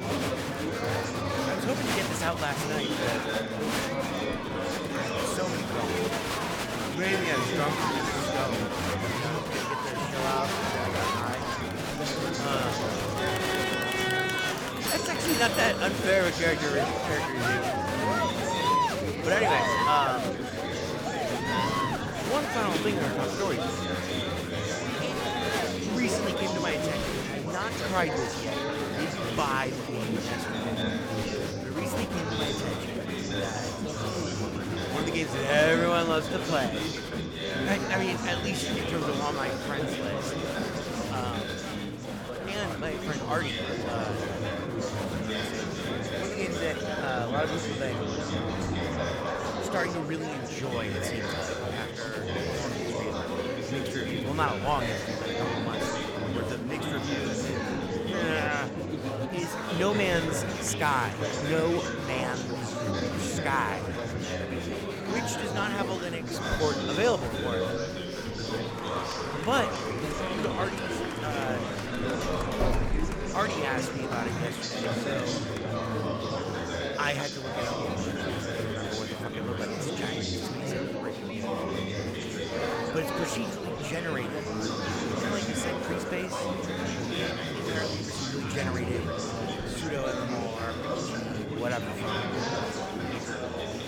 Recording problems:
chatter from many people; very loud; throughout; 2 dB above the speech
doorbell; noticeable; from 15 to 16 s; peak level with the speech
keyboard typing; faint; from 19 to 22 s; peak 15 dB below the speech
door banging; loud; from 1:12 to 1:13; peak 2 dB above the speech

